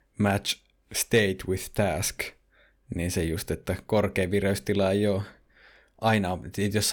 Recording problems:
abrupt cut into speech; at the end

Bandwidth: 18.5 kHz